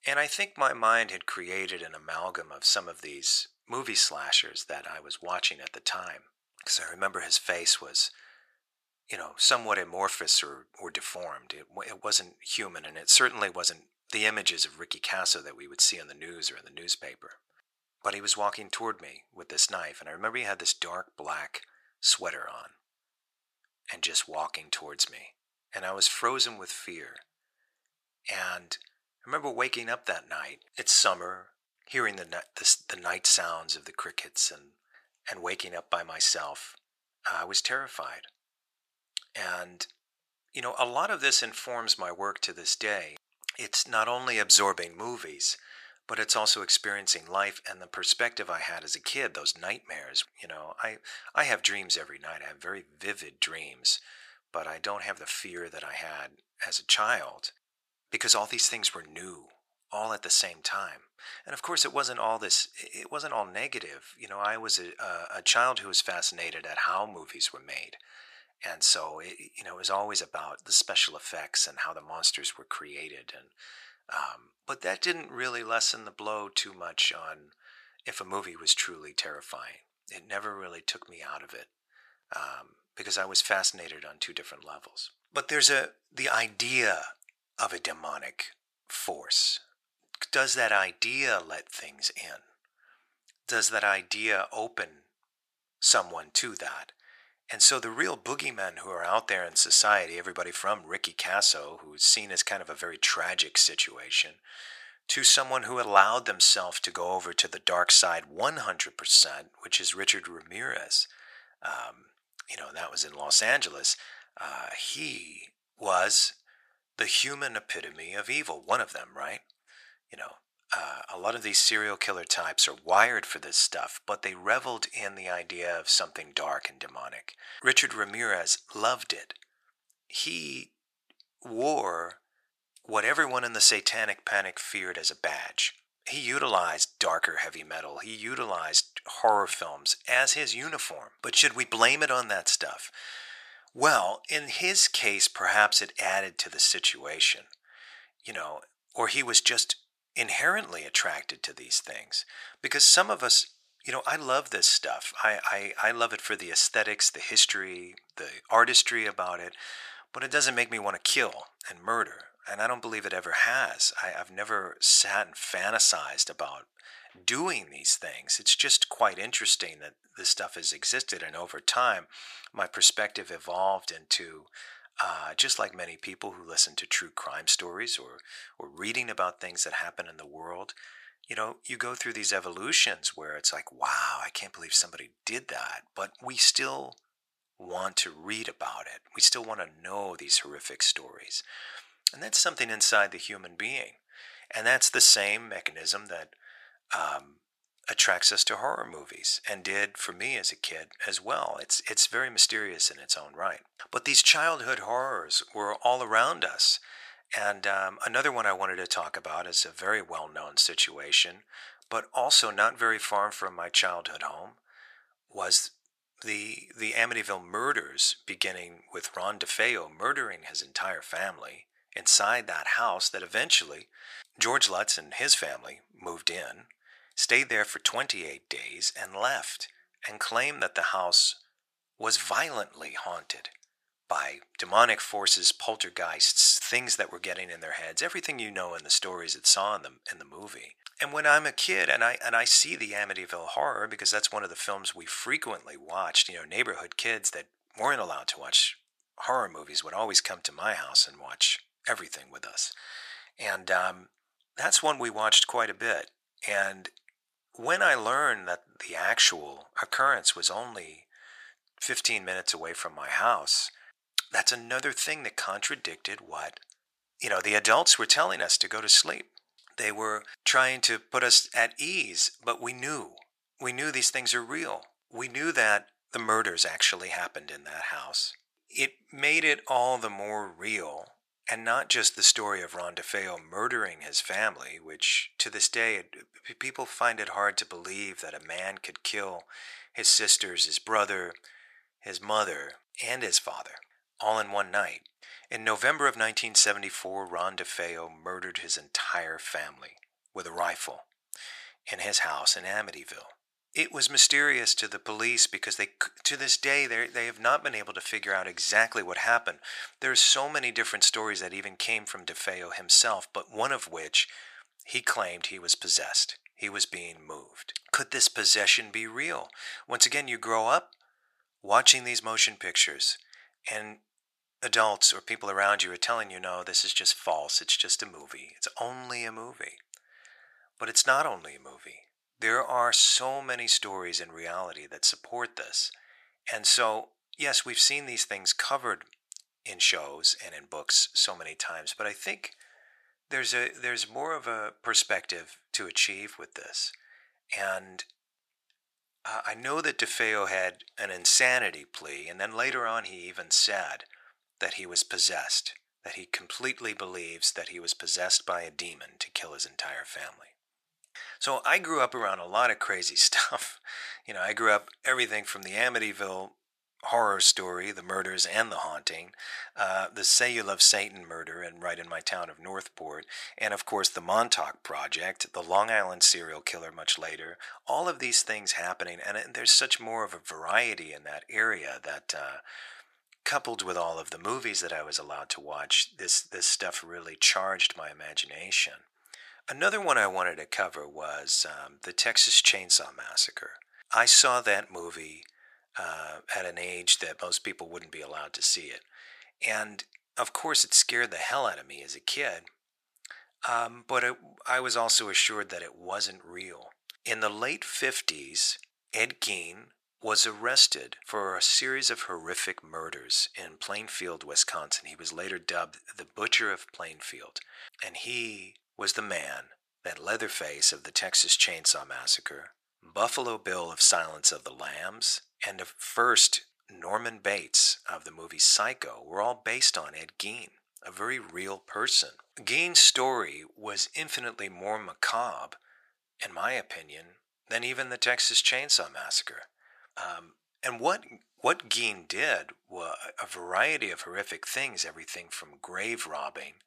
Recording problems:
thin; very; fading below 950 Hz

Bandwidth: 14.5 kHz